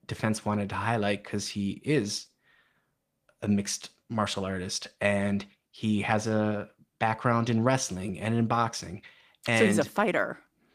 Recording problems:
garbled, watery; slightly; nothing above 15 kHz

